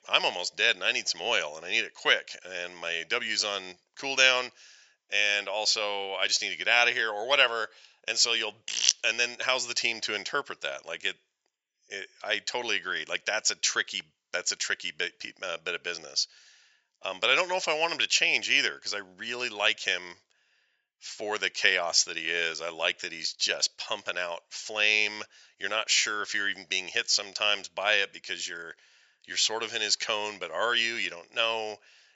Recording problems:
thin; very; fading below 850 Hz
high frequencies cut off; noticeable; nothing above 8 kHz

